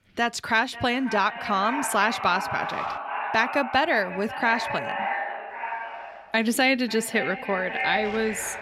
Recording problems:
echo of what is said; strong; throughout; 540 ms later, 7 dB below the speech
wind noise on the microphone; occasional gusts; until 3 s and from 5.5 s on; 25 dB below the speech

